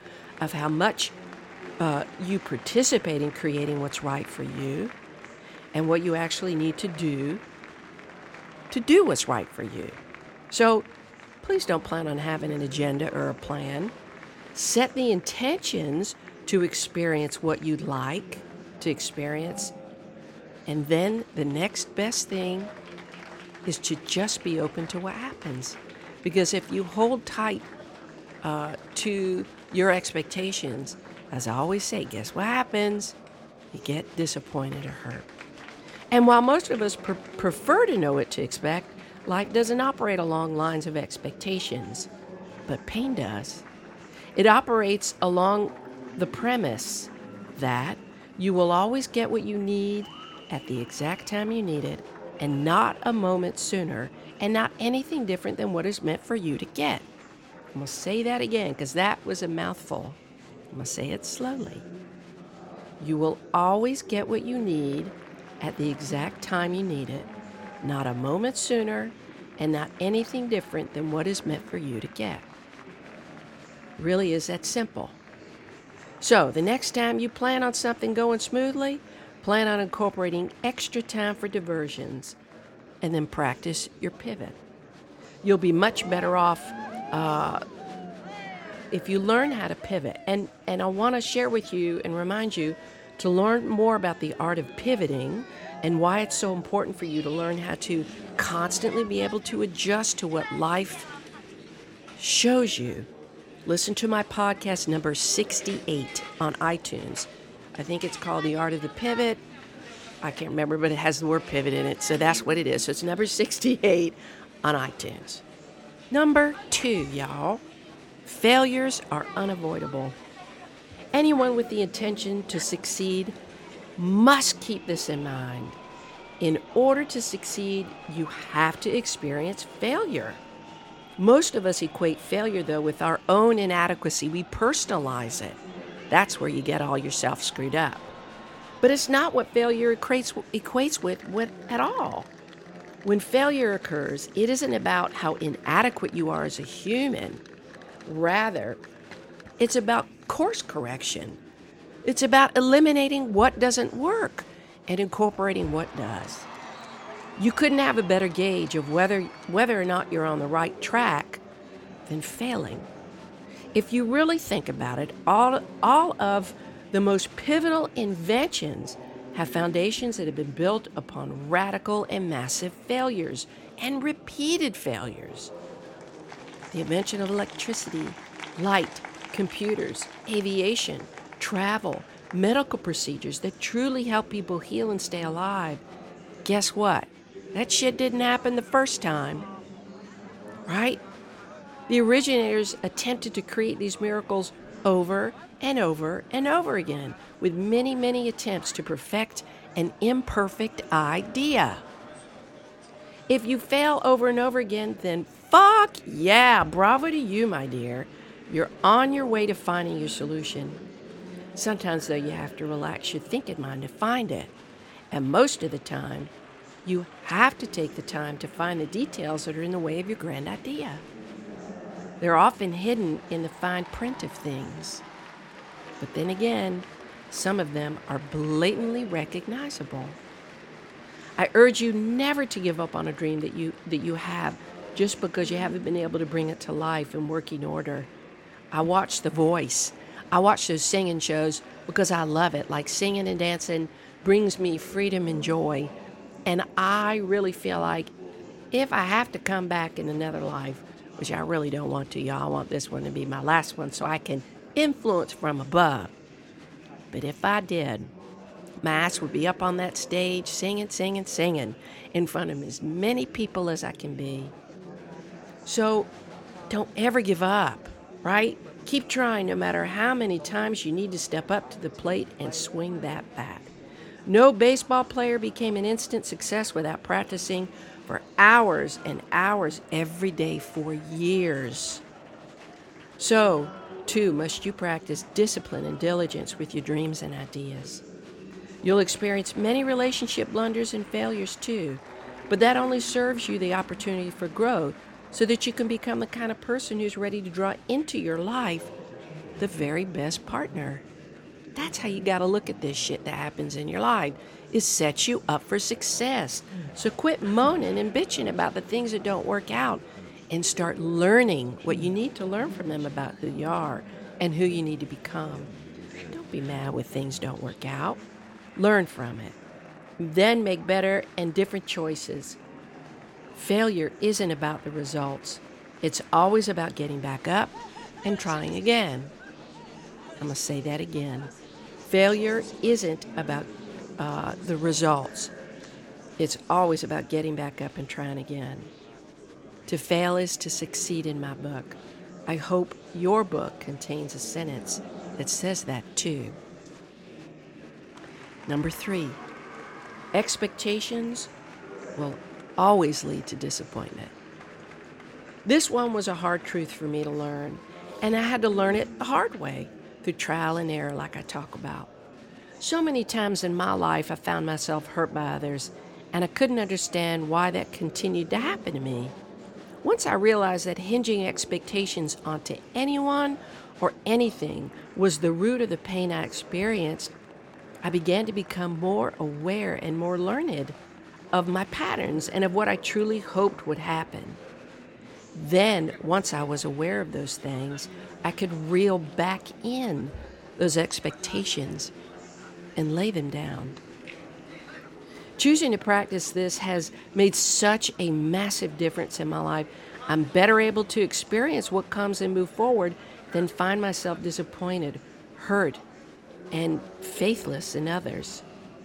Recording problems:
murmuring crowd; noticeable; throughout; 20 dB below the speech

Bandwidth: 17 kHz